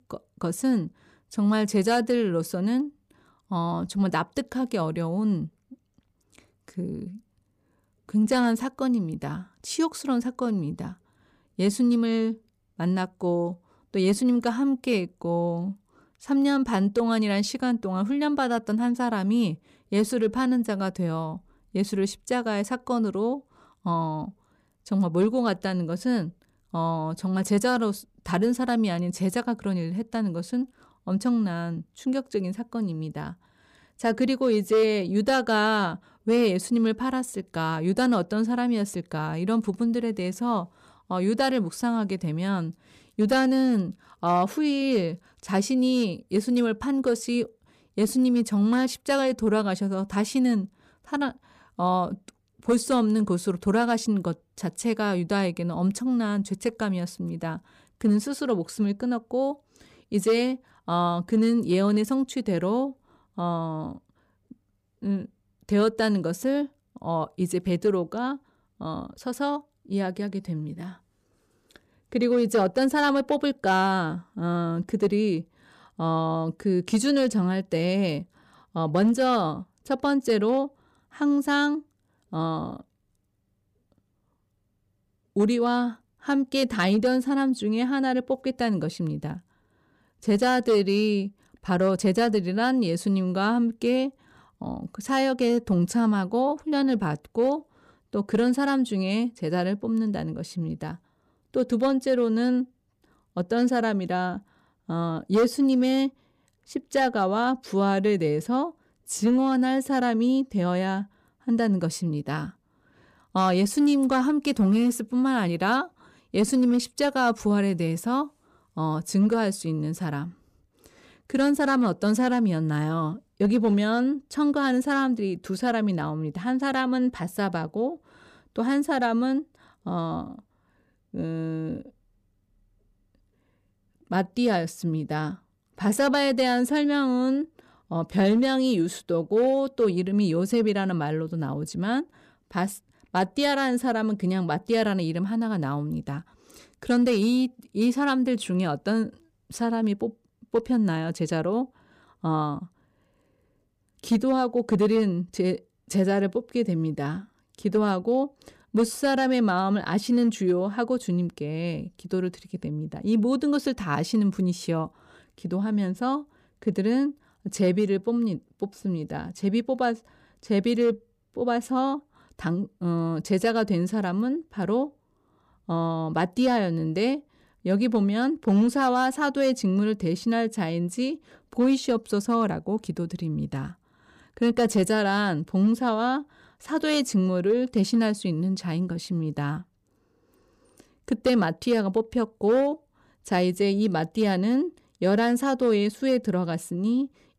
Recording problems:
none

